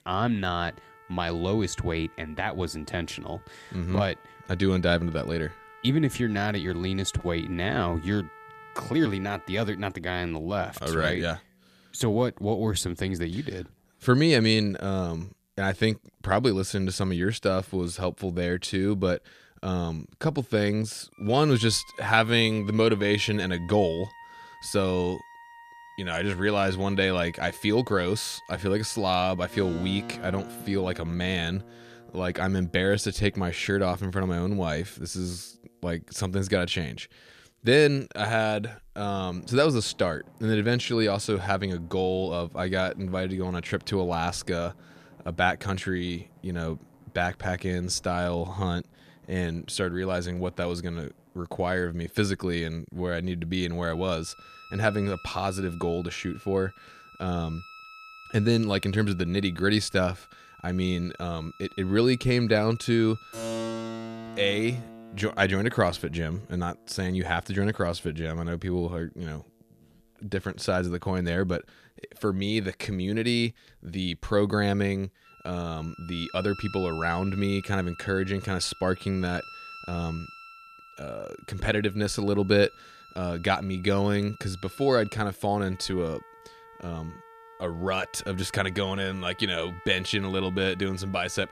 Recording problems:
background music; noticeable; throughout; 20 dB below the speech

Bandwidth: 14.5 kHz